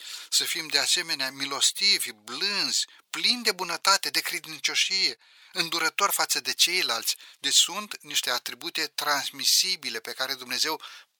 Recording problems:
thin; very; fading below 750 Hz

